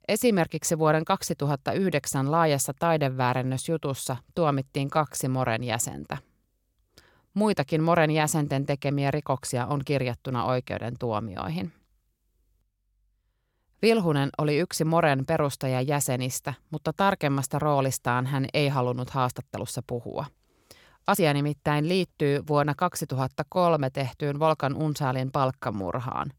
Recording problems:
uneven, jittery; slightly; from 5 to 26 s

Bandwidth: 17 kHz